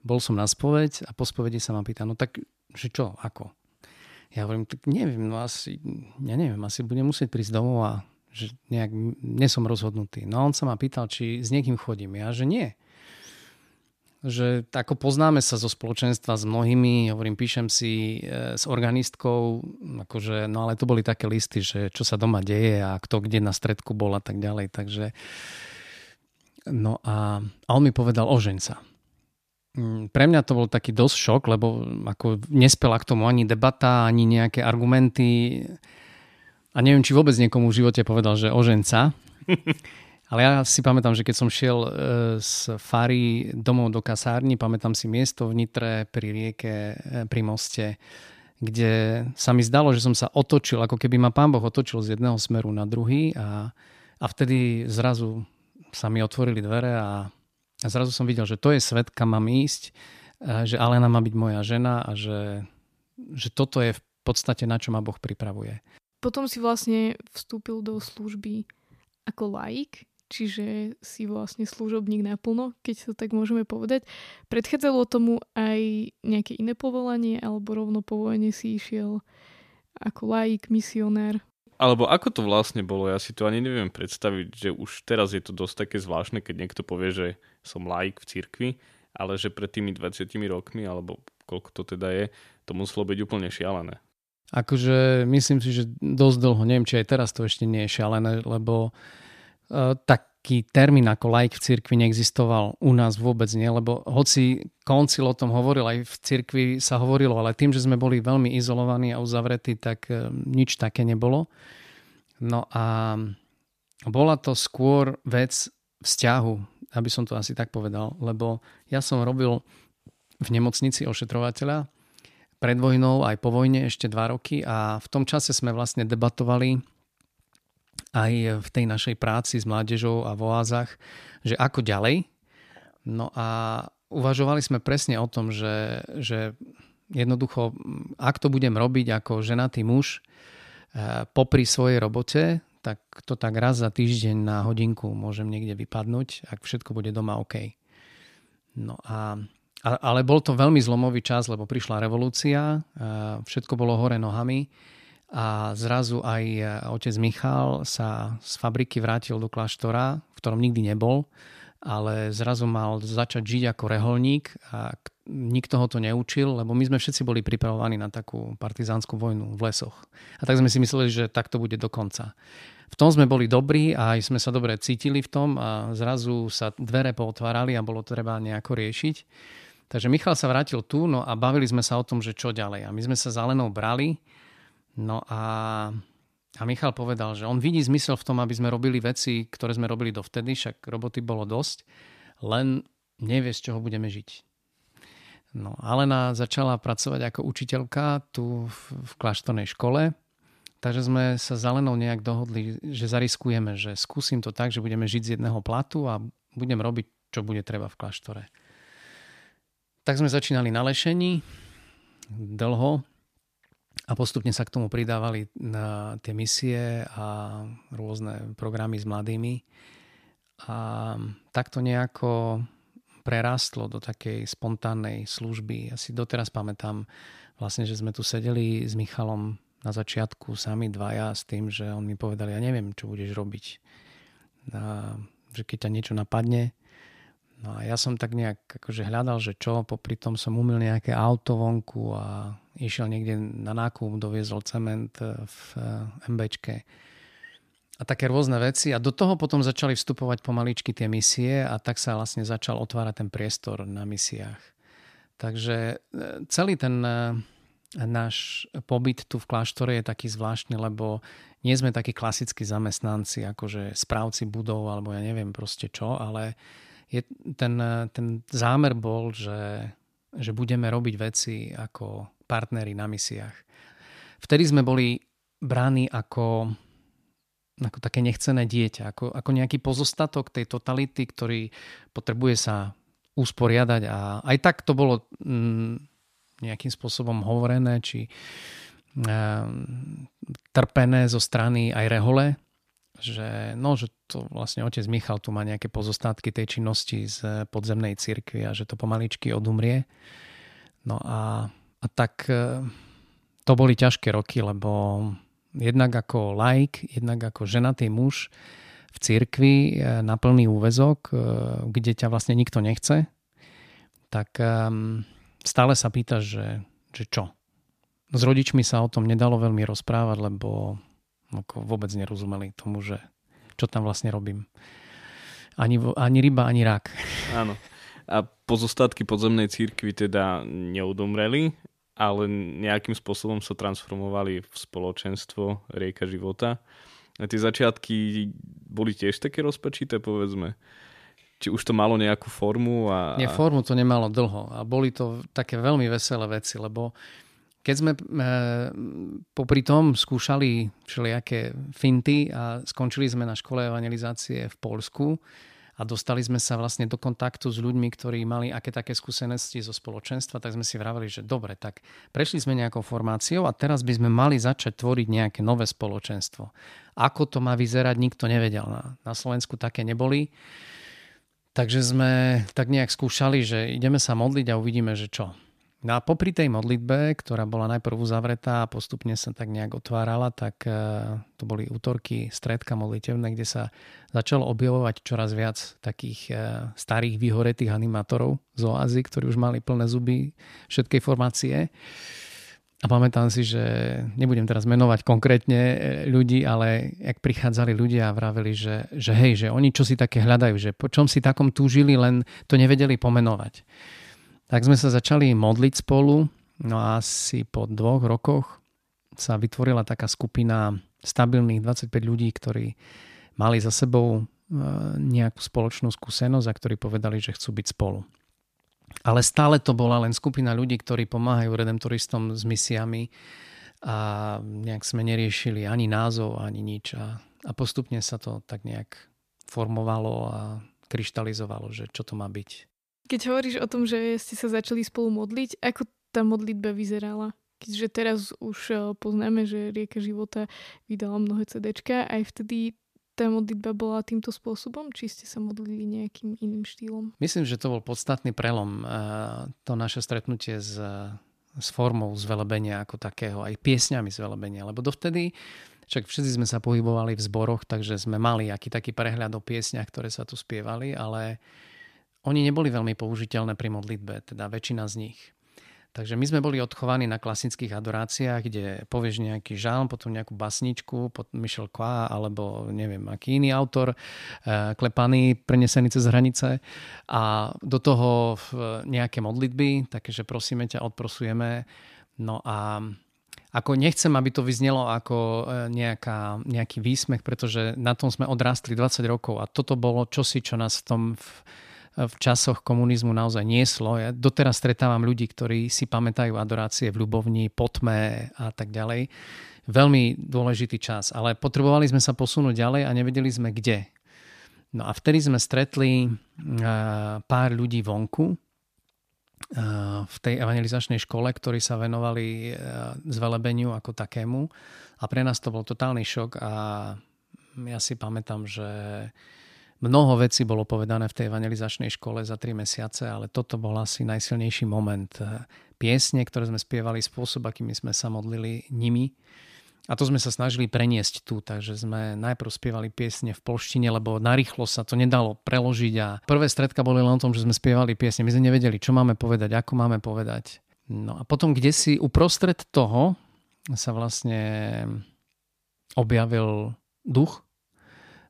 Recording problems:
none

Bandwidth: 14.5 kHz